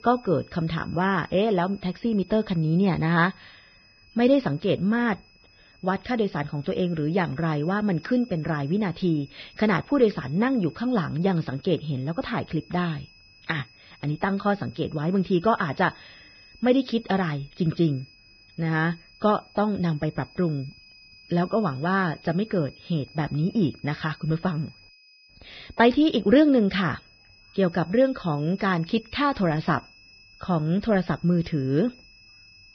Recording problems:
garbled, watery; badly; nothing above 5.5 kHz
high-pitched whine; faint; throughout; 2.5 kHz, 25 dB below the speech

